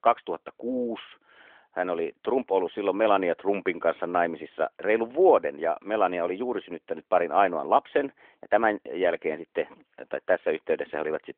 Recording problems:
phone-call audio; nothing above 3.5 kHz

